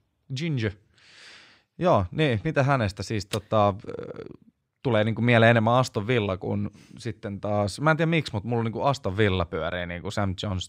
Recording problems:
none

